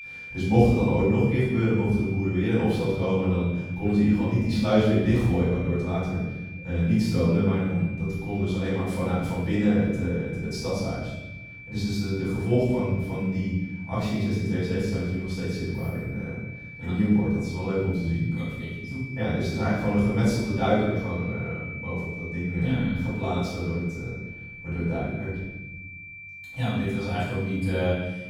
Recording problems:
room echo; strong; dies away in 1.1 s
off-mic speech; far
high-pitched whine; noticeable; throughout; 2.5 kHz, 15 dB below the speech

